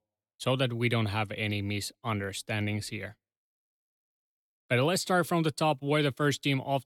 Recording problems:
none

